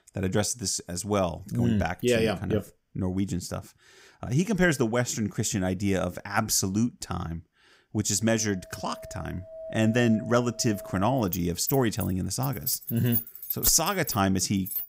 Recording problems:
household noises; loud; from 9 s on; 7 dB below the speech

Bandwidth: 15.5 kHz